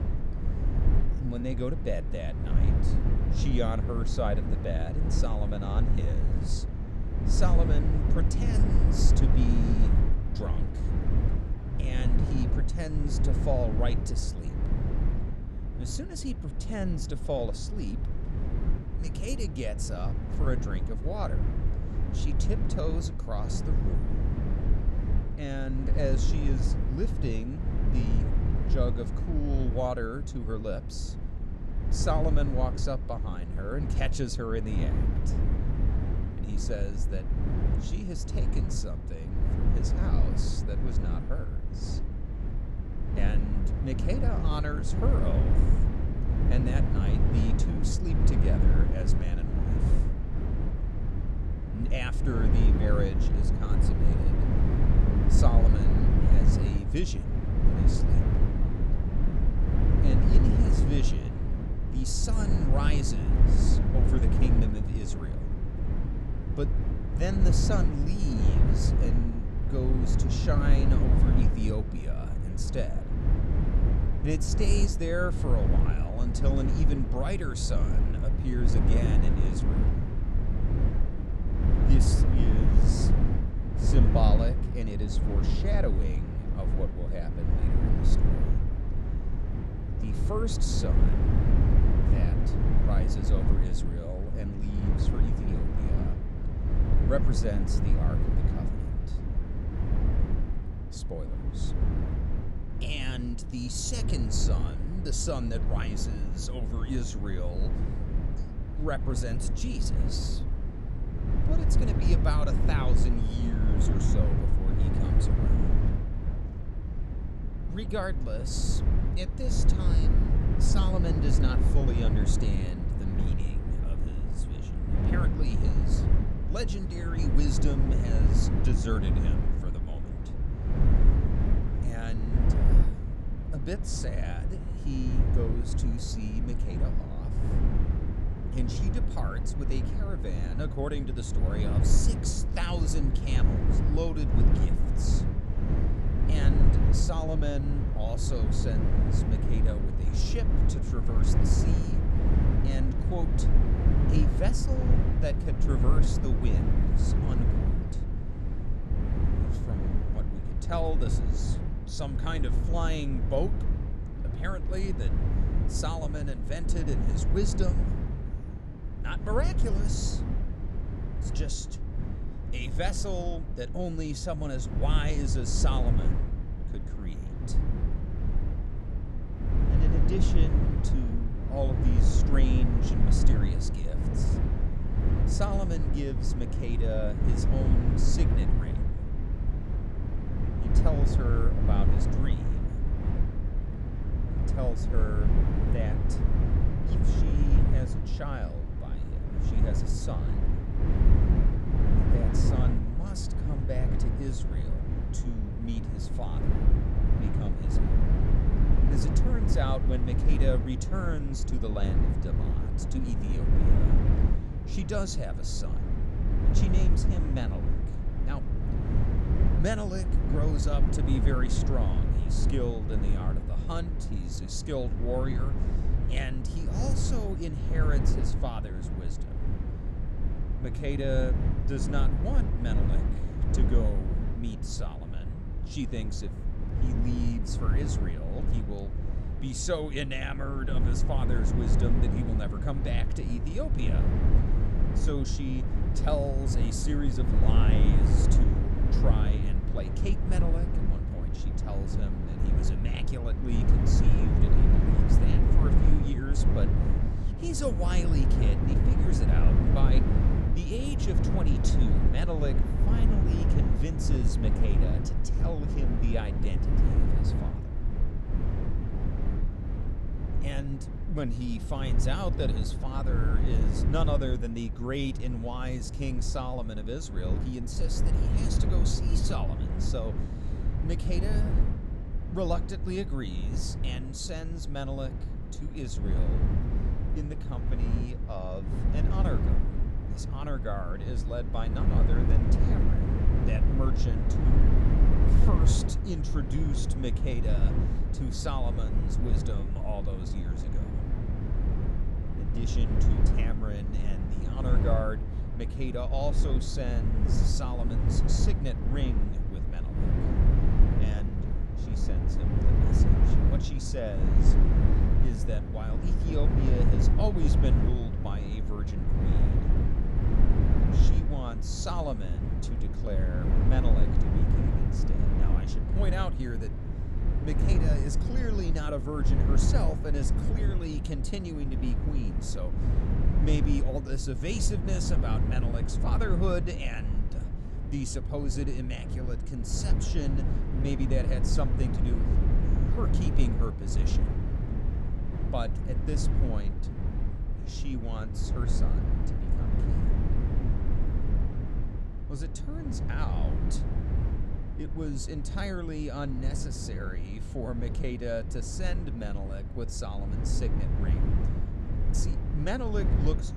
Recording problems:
low rumble; loud; throughout; 2 dB below the speech

